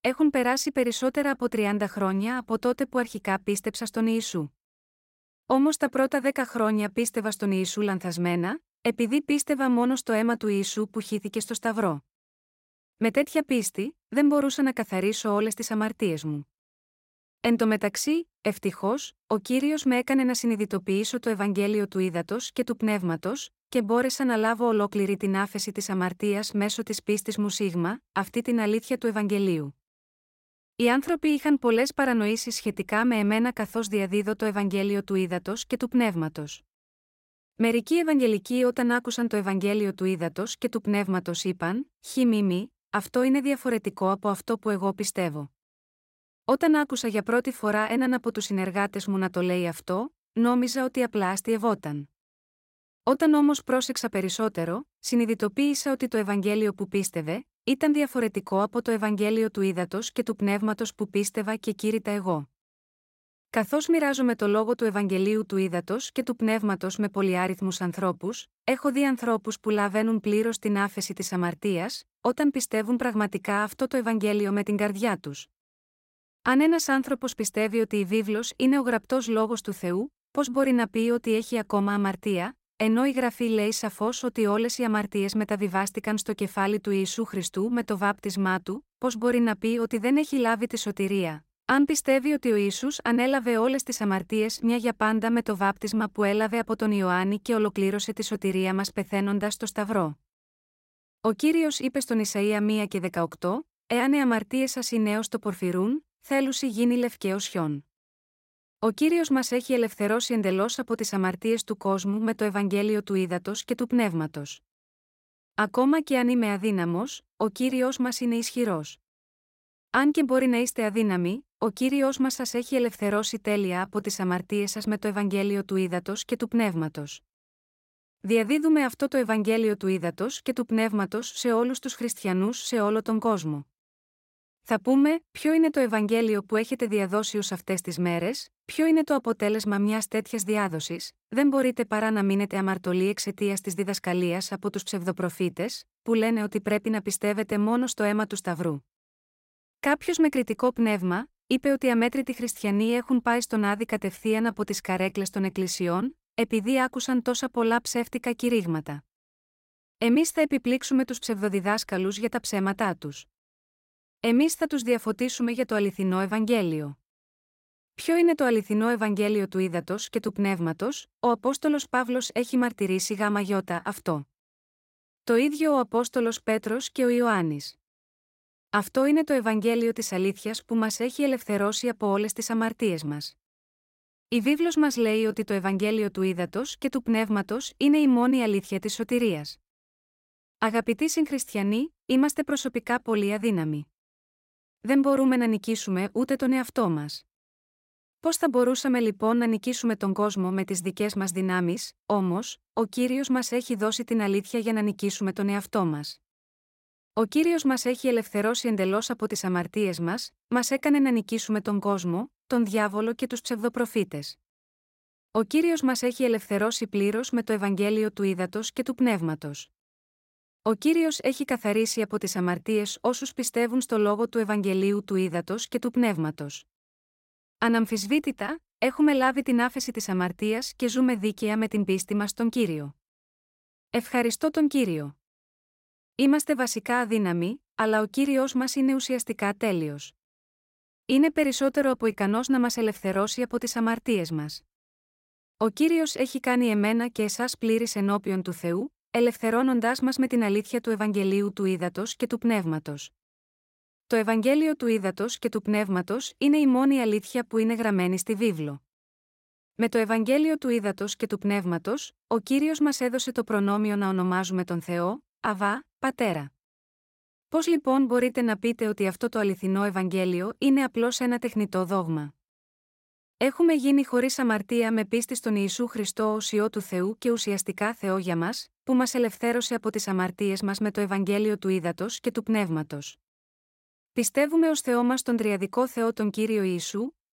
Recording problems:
none

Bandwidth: 16 kHz